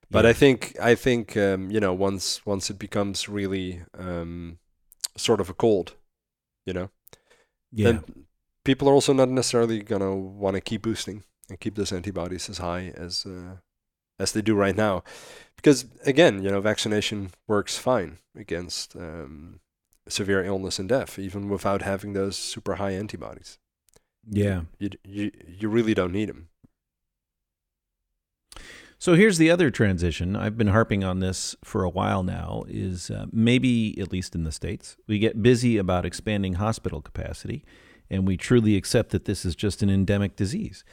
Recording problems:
none

